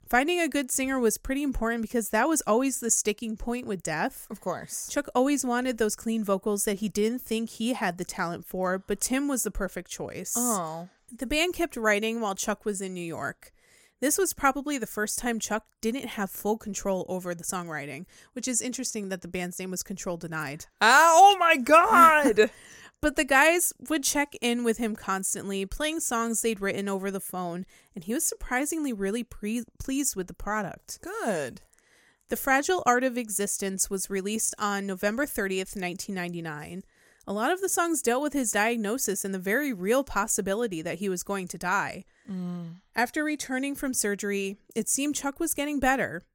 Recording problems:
none

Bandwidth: 16.5 kHz